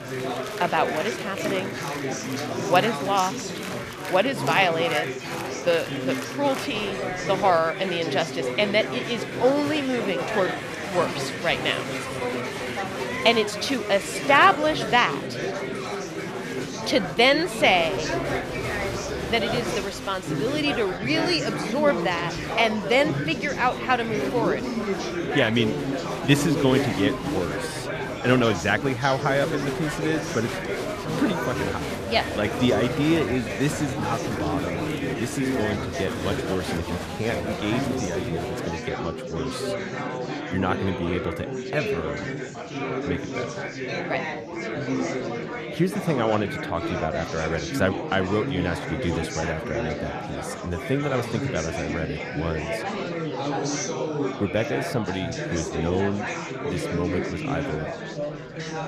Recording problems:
murmuring crowd; loud; throughout; 4 dB below the speech

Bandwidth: 14.5 kHz